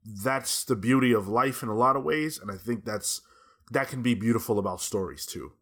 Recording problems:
none

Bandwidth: 18.5 kHz